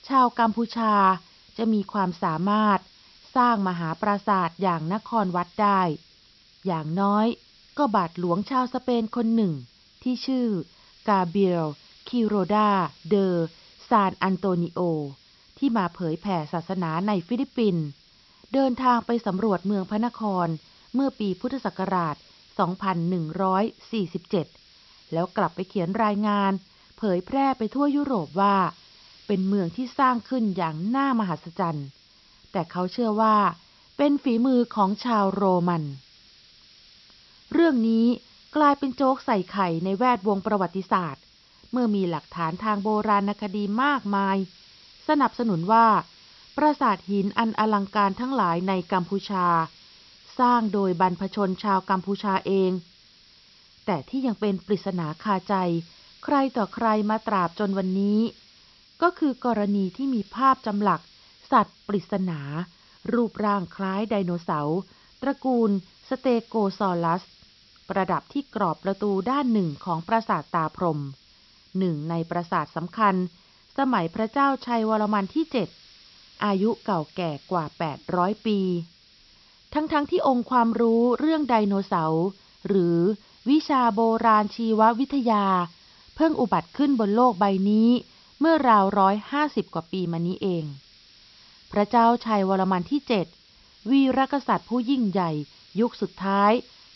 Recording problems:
high frequencies cut off; noticeable; nothing above 5.5 kHz
hiss; faint; throughout; 25 dB below the speech

